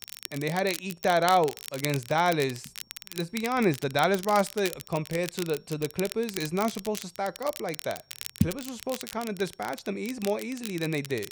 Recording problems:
crackle, like an old record; noticeable; 10 dB below the speech
high-pitched whine; faint; throughout; 5.5 kHz, 35 dB below the speech

